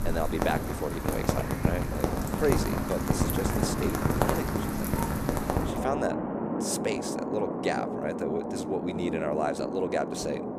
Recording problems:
rain or running water; very loud; throughout; 2 dB above the speech

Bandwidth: 14.5 kHz